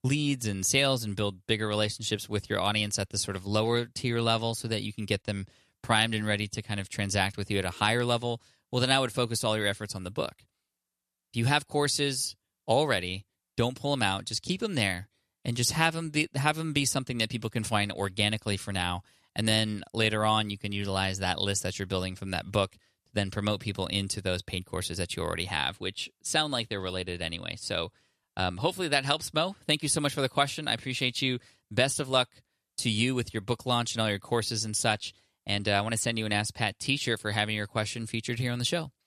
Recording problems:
none

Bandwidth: 13.5 kHz